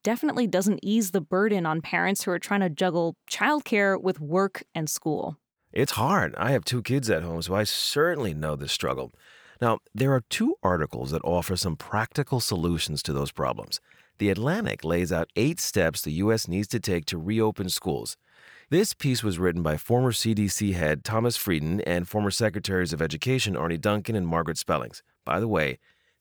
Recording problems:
none

